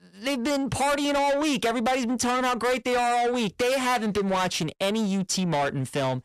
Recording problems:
distortion; heavy; 6 dB below the speech

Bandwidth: 14.5 kHz